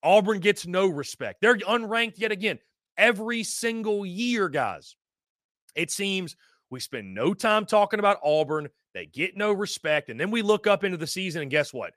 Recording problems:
none

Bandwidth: 14.5 kHz